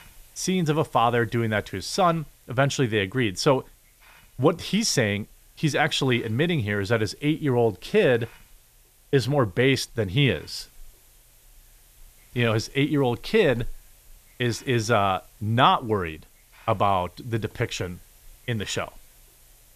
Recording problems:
hiss; faint; throughout; 30 dB below the speech

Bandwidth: 14.5 kHz